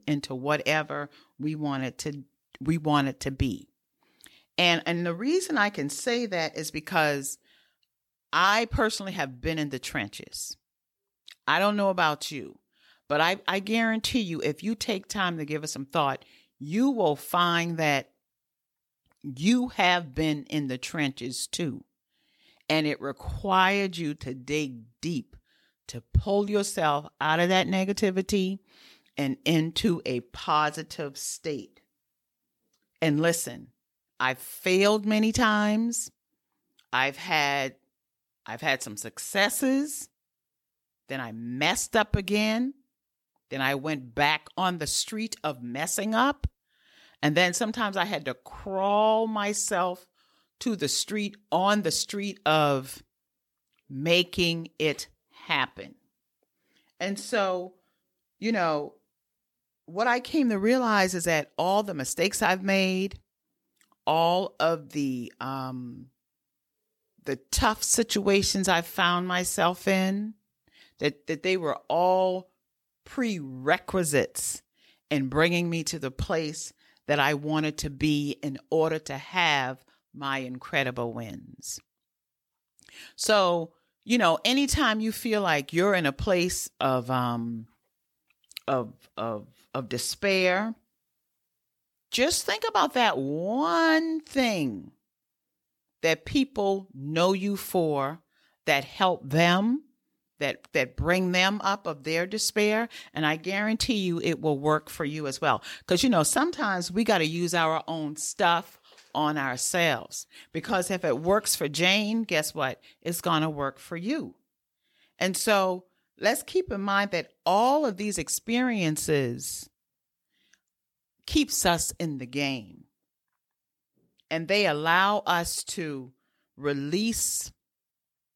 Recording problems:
none

